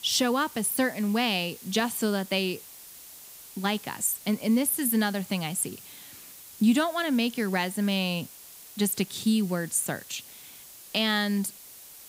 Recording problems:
hiss; noticeable; throughout; 15 dB below the speech

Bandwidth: 15.5 kHz